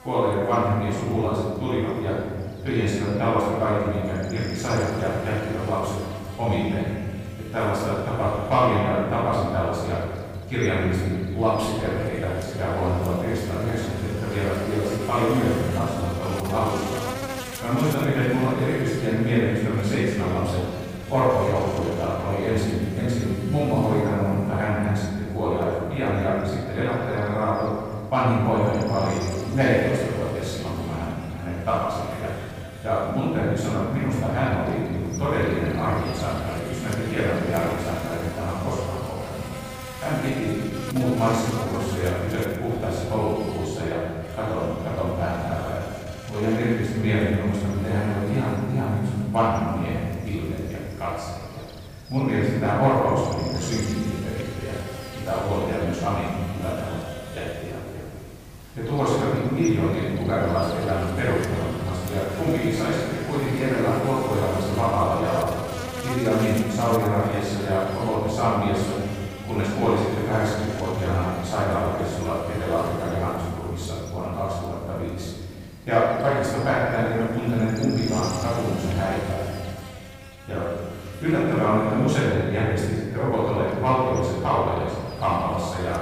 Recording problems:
room echo; strong; dies away in 2.1 s
off-mic speech; far
electrical hum; noticeable; throughout; 50 Hz, 15 dB below the speech

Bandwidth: 15 kHz